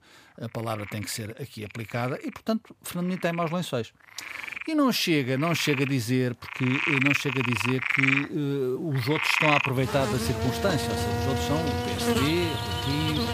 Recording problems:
animal sounds; very loud; throughout; 1 dB above the speech

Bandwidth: 15 kHz